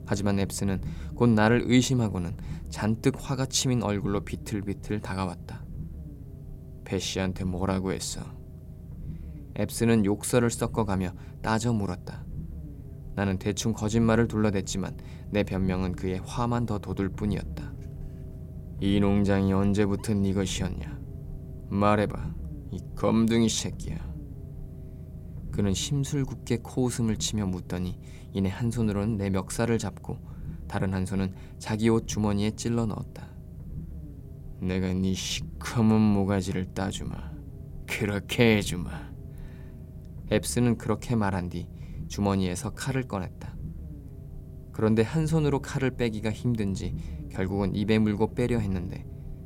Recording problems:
low rumble; faint; throughout; 20 dB below the speech

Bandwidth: 16.5 kHz